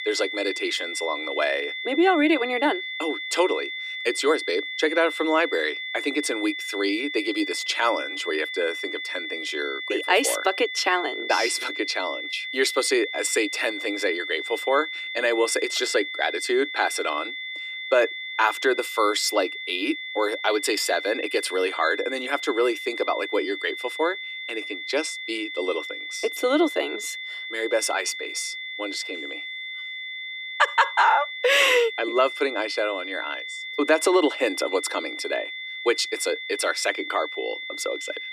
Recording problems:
thin; somewhat; fading below 300 Hz
high-pitched whine; loud; throughout; 2 kHz, 6 dB below the speech

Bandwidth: 14.5 kHz